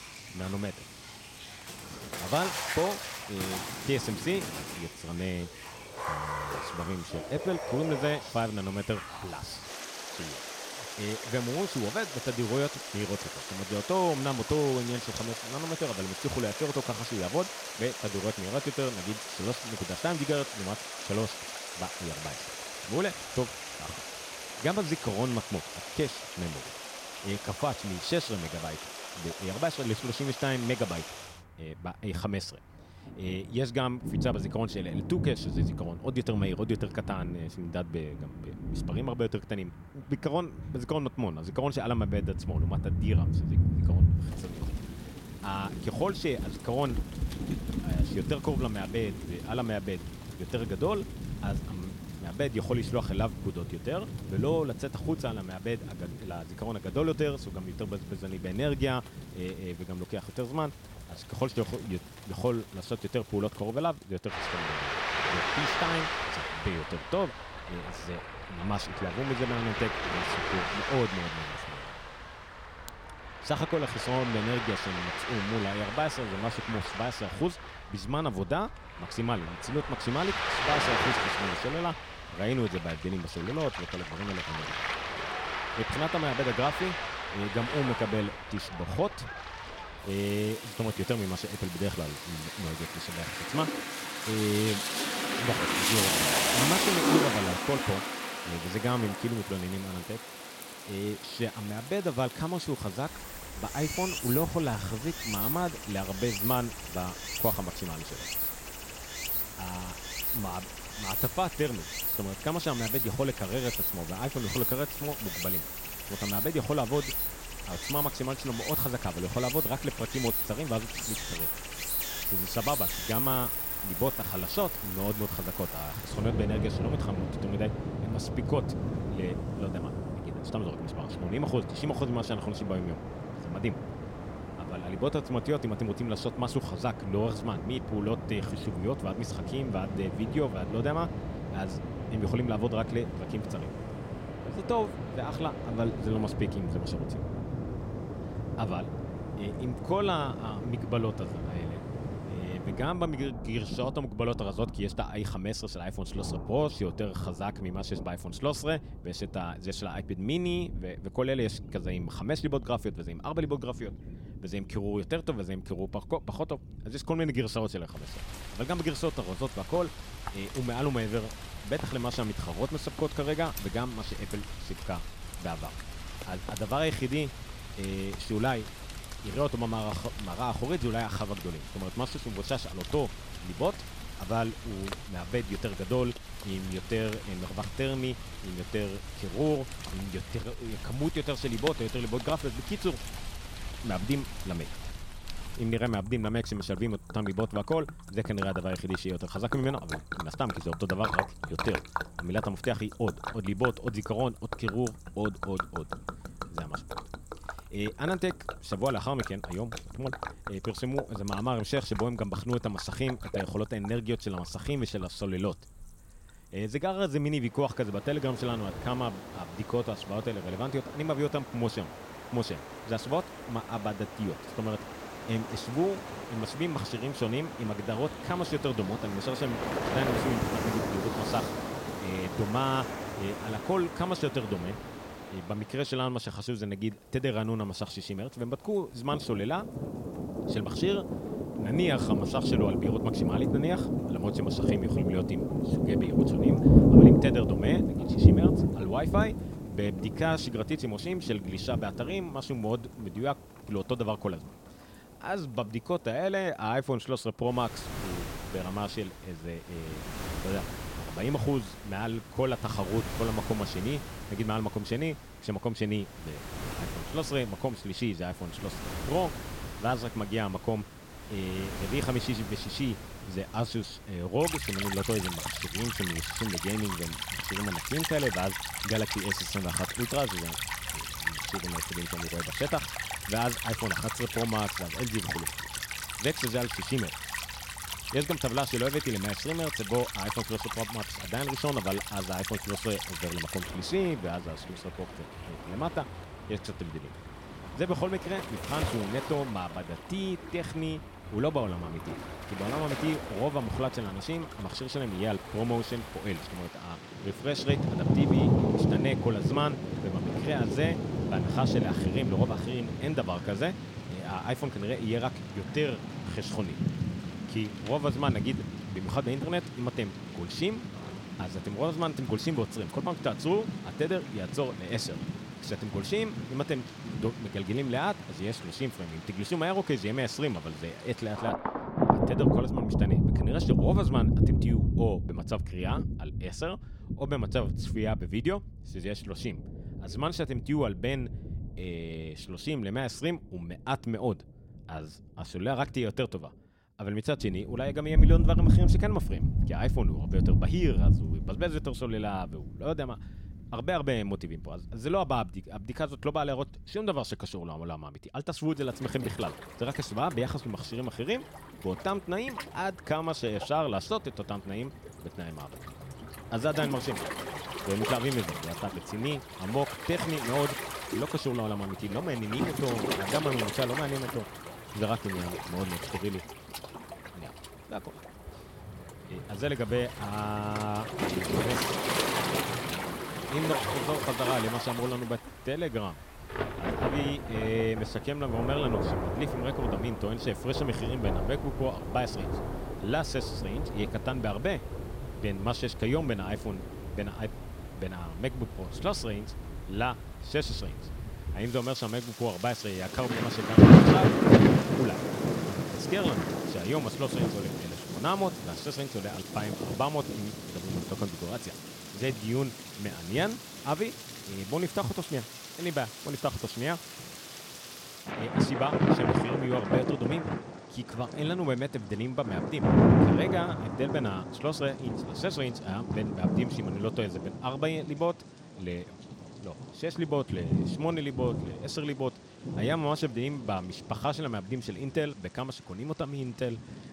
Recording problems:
rain or running water; very loud; throughout; 1 dB above the speech

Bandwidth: 16.5 kHz